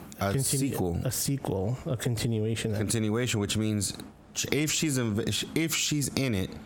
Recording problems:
squashed, flat; heavily

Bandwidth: 17 kHz